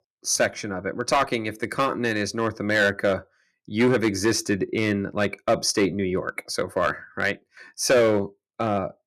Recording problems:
distortion; slight; 4% of the sound clipped

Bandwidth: 13.5 kHz